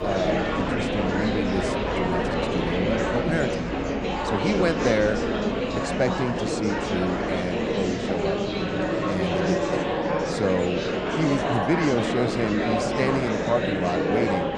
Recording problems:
murmuring crowd; very loud; throughout; 2 dB above the speech

